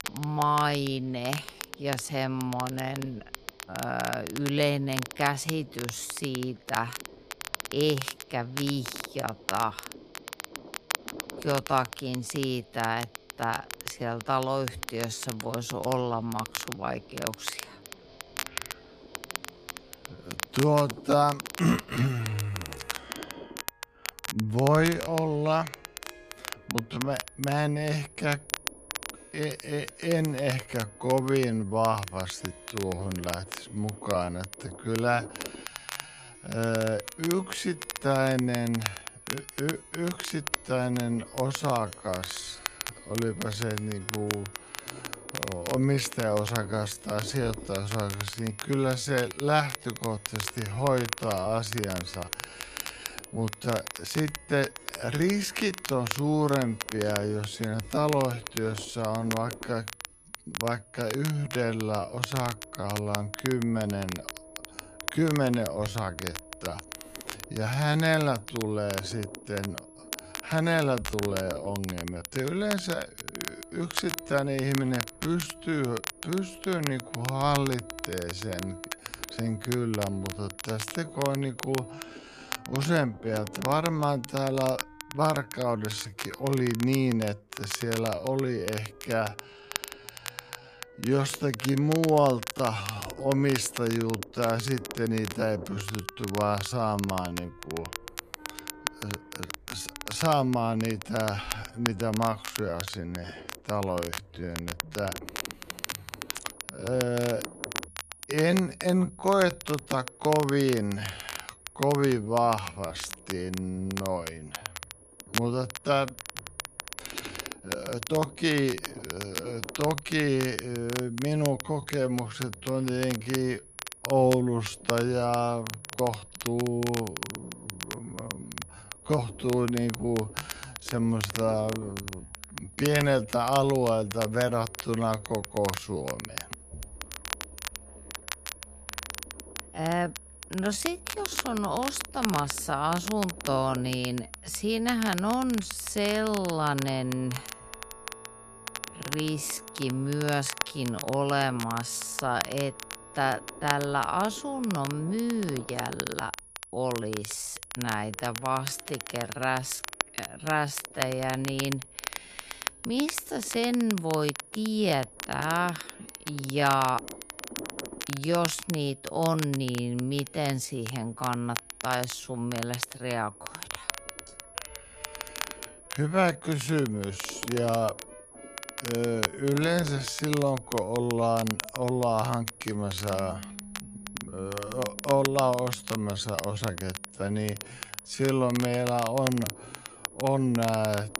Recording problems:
wrong speed, natural pitch; too slow; 0.5 times normal speed
crackle, like an old record; loud; 9 dB below the speech
high-pitched whine; faint; from 27 s to 1:22 and from 1:46 on; 10.5 kHz, 20 dB below the speech
background music; faint; throughout; 25 dB below the speech
low rumble; faint; throughout; 25 dB below the speech

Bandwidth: 14.5 kHz